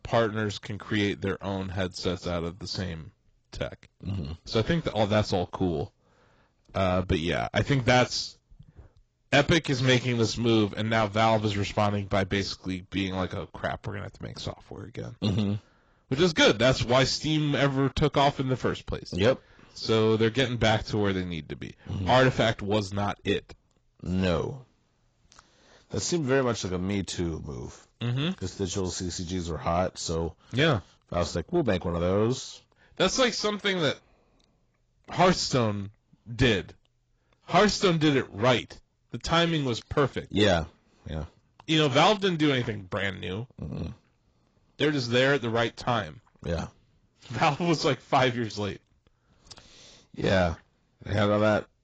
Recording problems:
garbled, watery; badly; nothing above 7.5 kHz
distortion; slight; 10 dB below the speech

